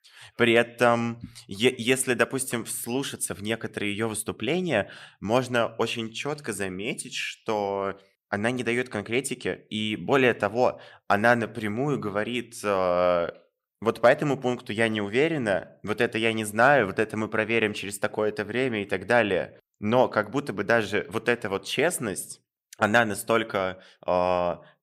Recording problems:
none

